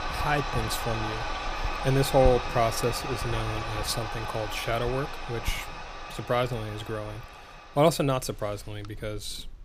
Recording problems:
household noises; loud; throughout; 5 dB below the speech

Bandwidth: 15 kHz